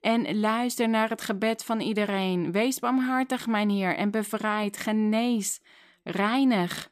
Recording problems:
none

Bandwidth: 14.5 kHz